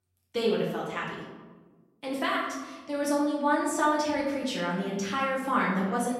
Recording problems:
off-mic speech; far
room echo; noticeable; dies away in 1.1 s

